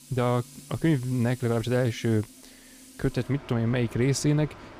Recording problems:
machinery noise; noticeable; throughout; 20 dB below the speech

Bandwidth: 15.5 kHz